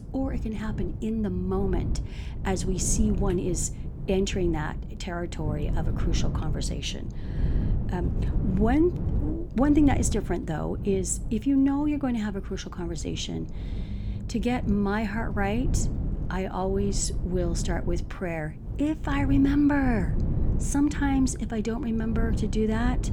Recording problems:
wind noise on the microphone; occasional gusts; 10 dB below the speech
low rumble; faint; throughout; 25 dB below the speech

